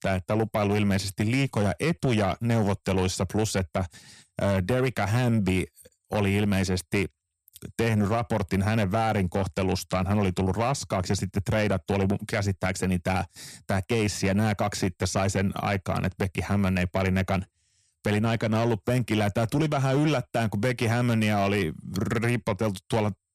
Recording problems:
distortion; slight; 10 dB below the speech

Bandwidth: 14.5 kHz